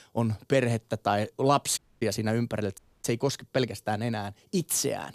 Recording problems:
audio cutting out; at 2 s and at 3 s

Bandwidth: 15 kHz